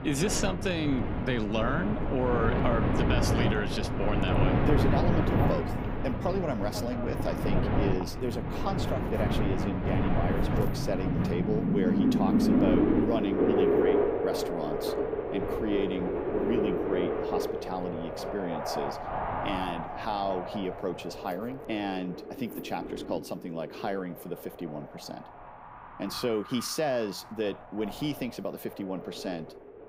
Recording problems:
wind in the background; very loud; throughout; 4 dB above the speech

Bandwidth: 15.5 kHz